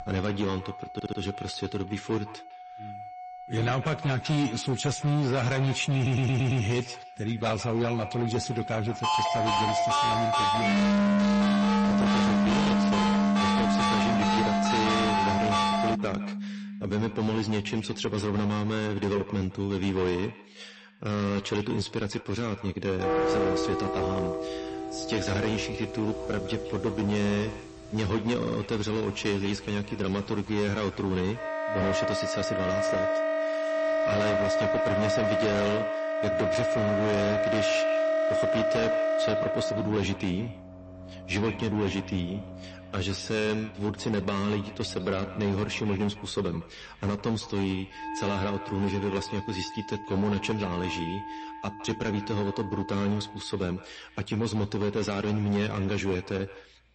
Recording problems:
distortion; heavy; 15% of the sound clipped
echo of what is said; noticeable; throughout; 160 ms later, 15 dB below the speech
garbled, watery; slightly; nothing above 8 kHz
background music; very loud; throughout; 2 dB above the speech
audio stuttering; at 1 s, at 6 s and at 28 s
phone ringing; loud; from 9 to 16 s; peak 6 dB above the speech

